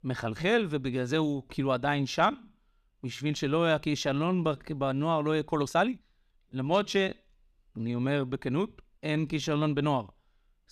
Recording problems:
uneven, jittery; strongly; from 2 to 9.5 s

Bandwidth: 14.5 kHz